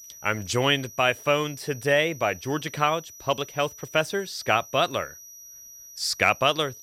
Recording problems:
high-pitched whine; noticeable; throughout; 6 kHz, 20 dB below the speech

